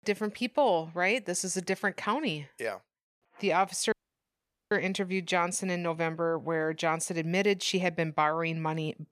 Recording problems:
audio cutting out; at 4 s for 1 s

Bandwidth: 14.5 kHz